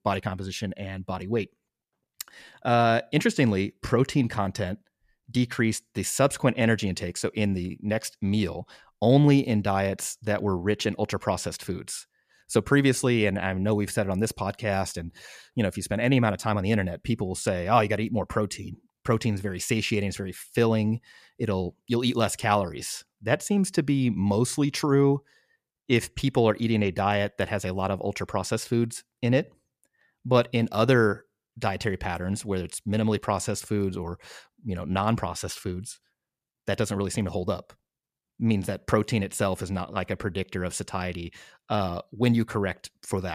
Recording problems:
abrupt cut into speech; at the end

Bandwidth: 14.5 kHz